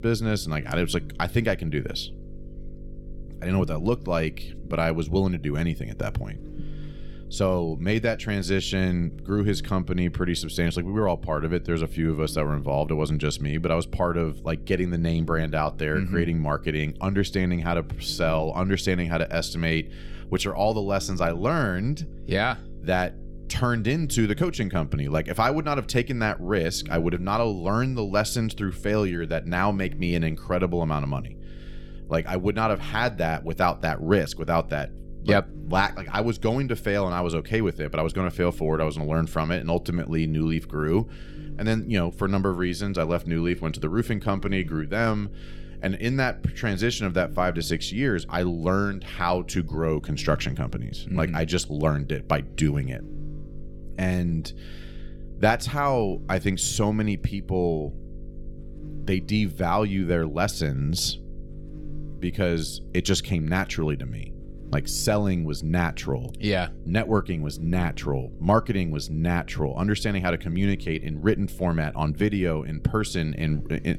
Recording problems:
electrical hum; faint; throughout; 50 Hz, 25 dB below the speech

